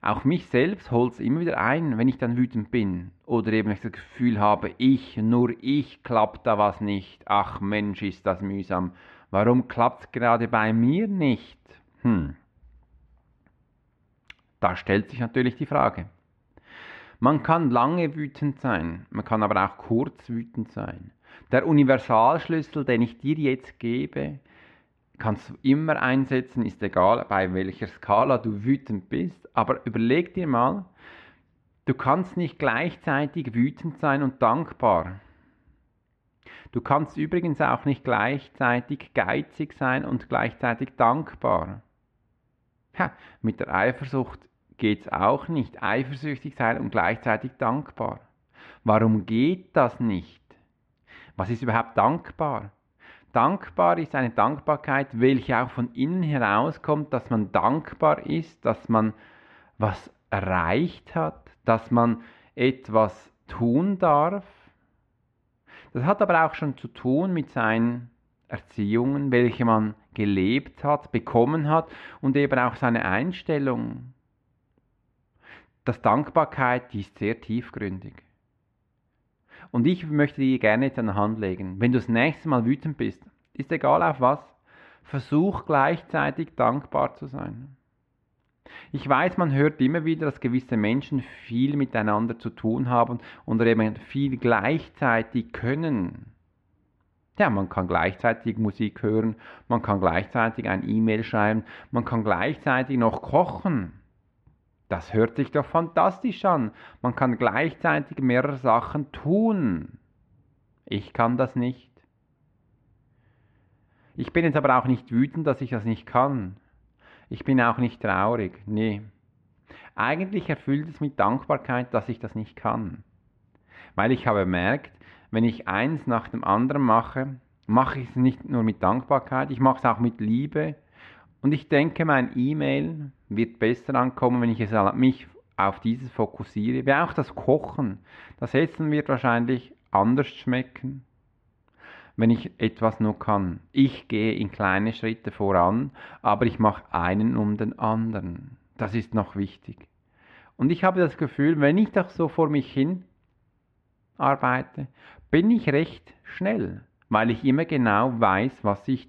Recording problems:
muffled; very; fading above 2.5 kHz

